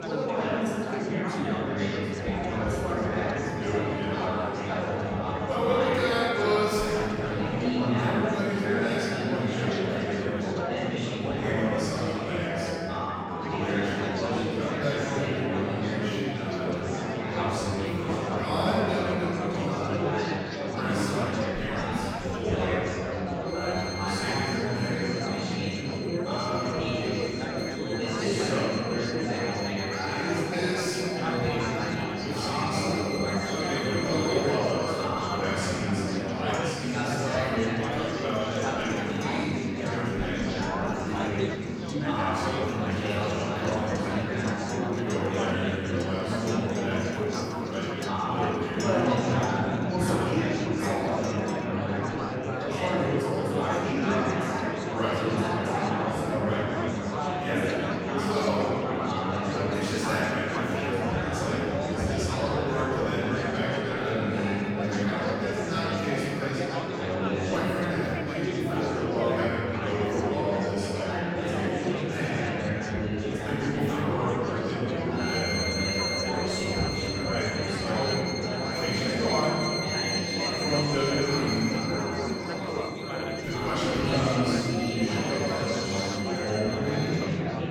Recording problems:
room echo; strong; dies away in 2.5 s
off-mic speech; far
chatter from many people; very loud; throughout; 2 dB above the speech
background music; loud; throughout; 6 dB below the speech

